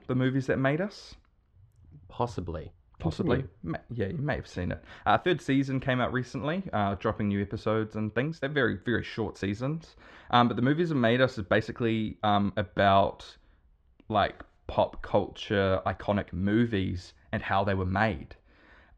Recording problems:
muffled; very; fading above 1.5 kHz
uneven, jittery; strongly; from 2 to 18 s

